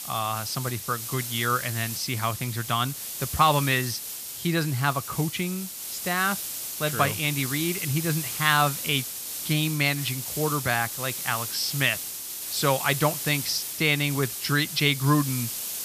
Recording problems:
hiss; loud; throughout; 5 dB below the speech

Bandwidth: 14.5 kHz